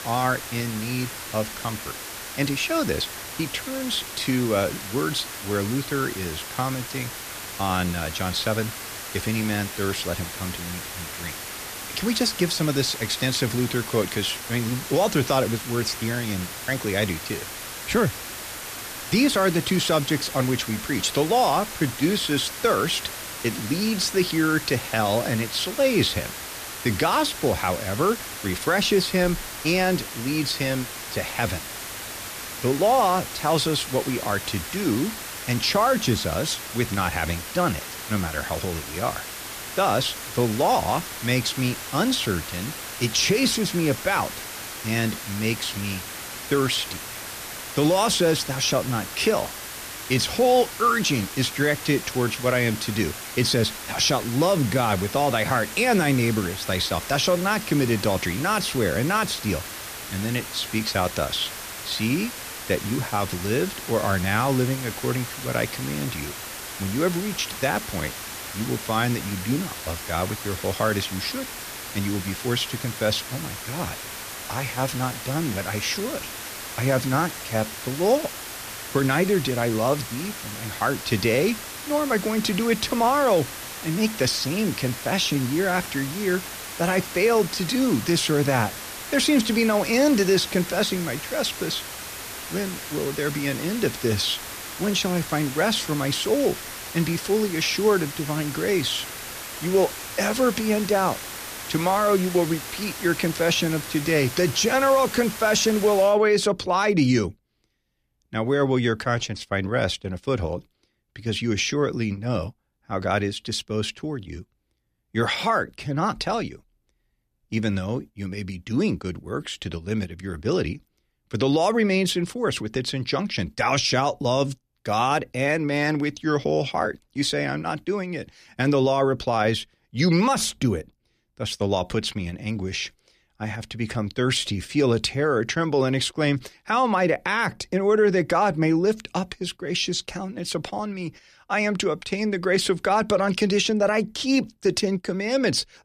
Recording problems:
hiss; loud; until 1:46; 9 dB below the speech

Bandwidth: 14.5 kHz